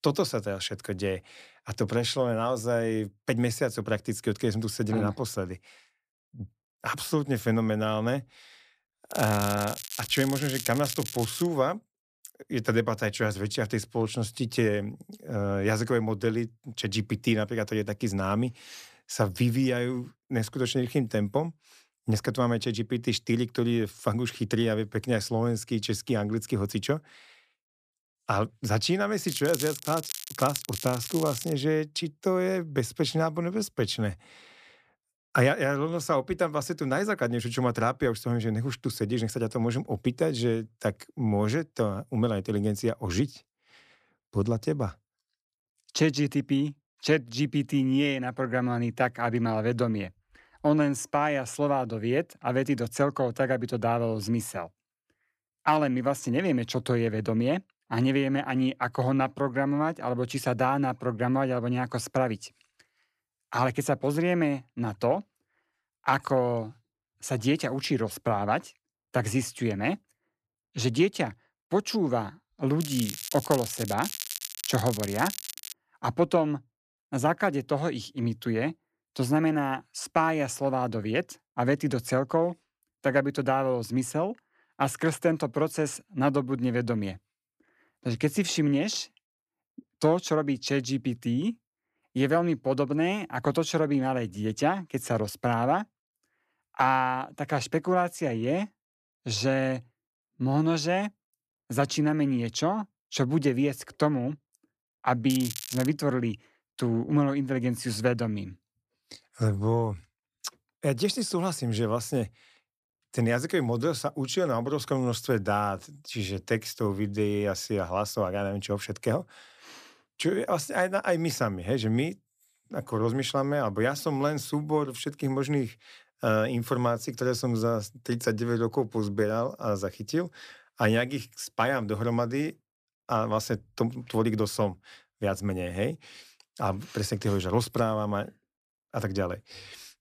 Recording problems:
crackling; loud; 4 times, first at 9 s; 8 dB below the speech

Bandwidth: 14.5 kHz